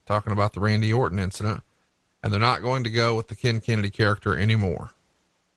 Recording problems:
garbled, watery; slightly

